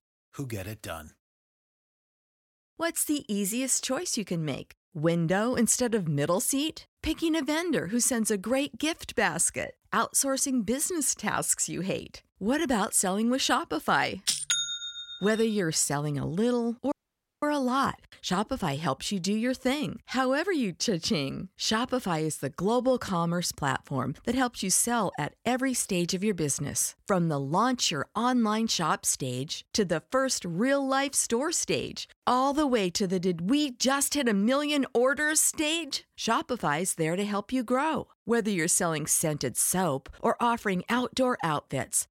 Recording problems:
audio cutting out; at 17 s for 0.5 s

